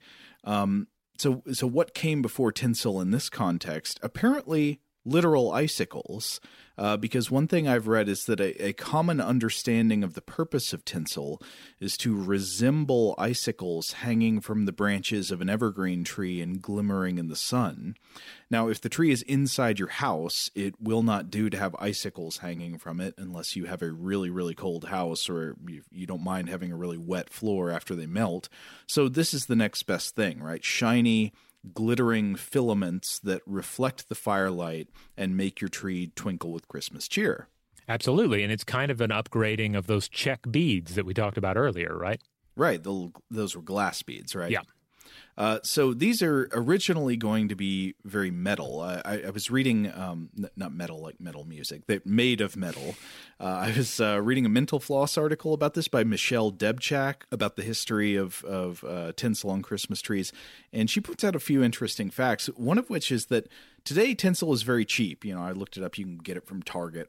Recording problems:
none

